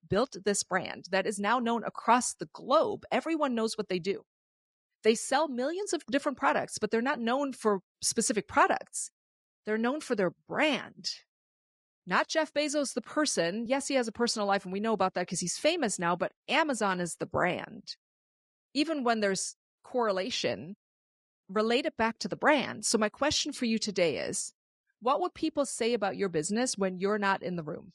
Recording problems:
garbled, watery; slightly; nothing above 10.5 kHz

